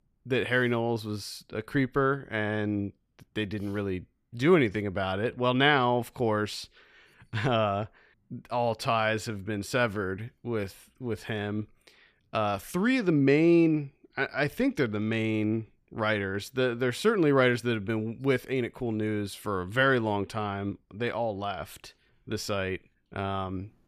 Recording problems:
none

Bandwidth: 14.5 kHz